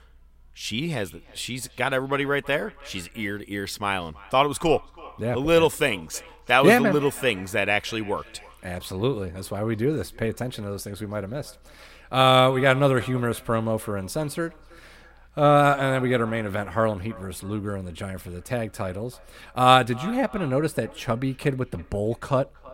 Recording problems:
echo of what is said; faint; throughout; 330 ms later, 20 dB below the speech

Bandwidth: 16 kHz